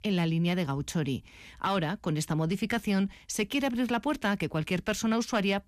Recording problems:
none

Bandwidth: 14.5 kHz